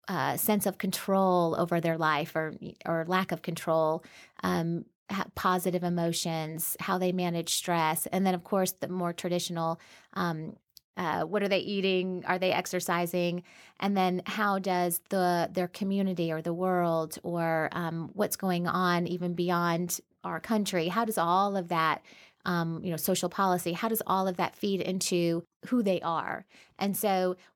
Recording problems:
none

